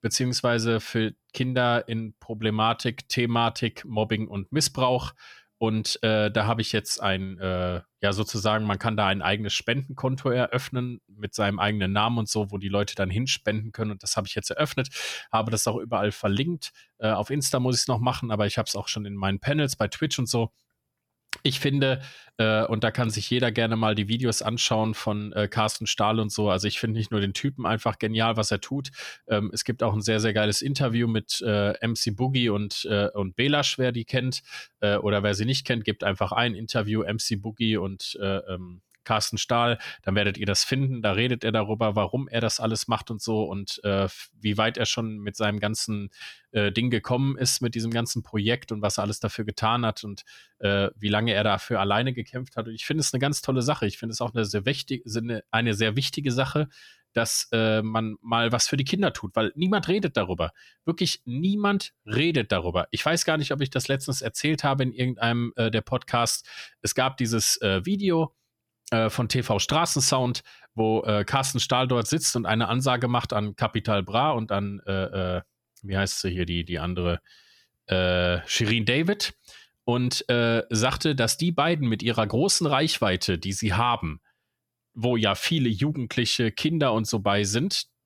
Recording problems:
none

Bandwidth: 17.5 kHz